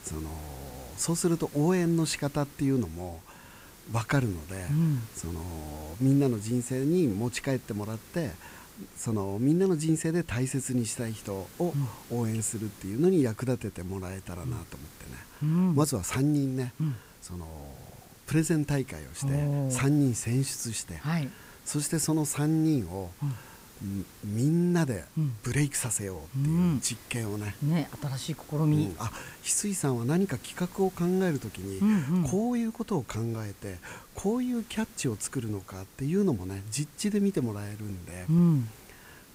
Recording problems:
hiss; faint; throughout; 20 dB below the speech

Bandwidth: 15.5 kHz